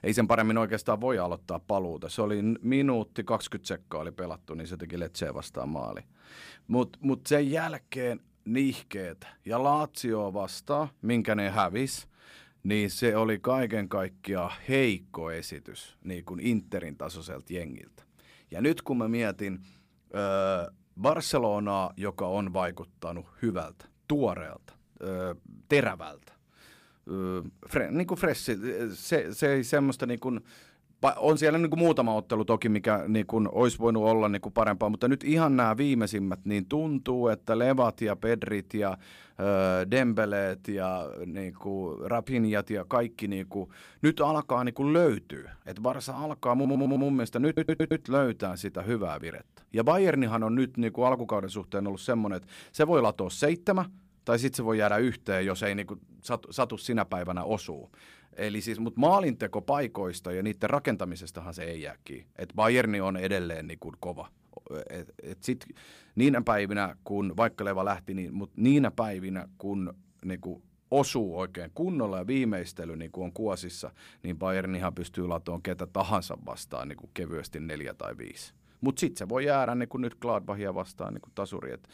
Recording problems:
audio stuttering; at 47 s

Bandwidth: 15 kHz